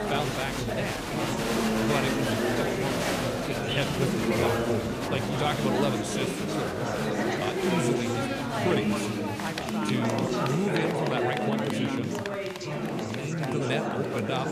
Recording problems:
chatter from many people; very loud; throughout; 4 dB above the speech

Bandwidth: 15 kHz